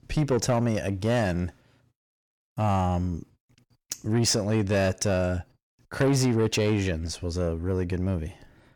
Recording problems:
distortion; slight; 10 dB below the speech

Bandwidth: 18.5 kHz